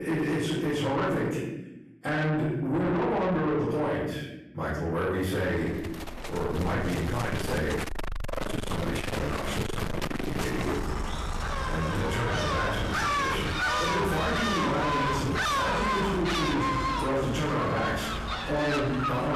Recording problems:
distortion; heavy; 6 dB below the speech
off-mic speech; far
room echo; noticeable; dies away in 0.8 s
animal sounds; loud; from 6 s on; 1 dB below the speech
abrupt cut into speech; at the start and the end

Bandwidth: 14 kHz